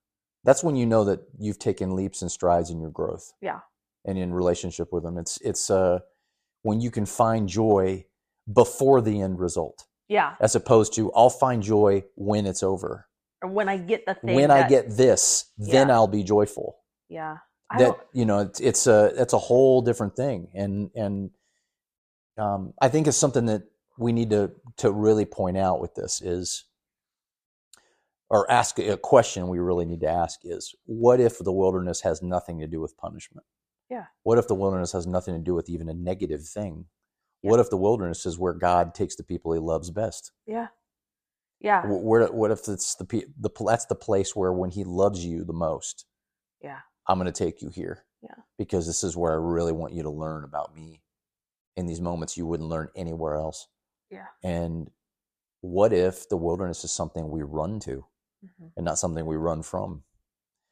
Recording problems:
none

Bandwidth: 14.5 kHz